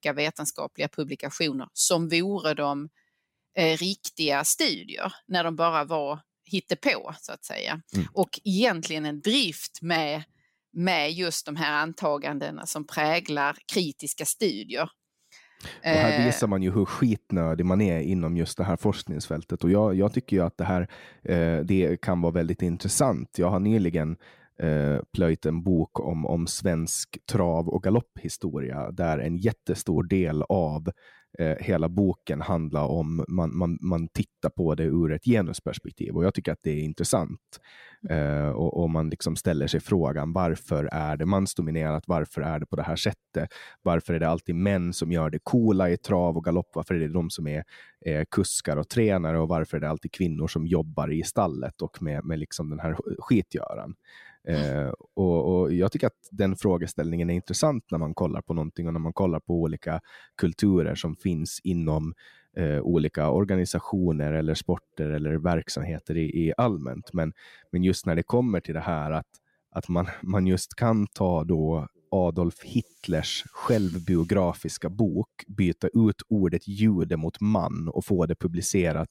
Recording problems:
none

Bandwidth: 16 kHz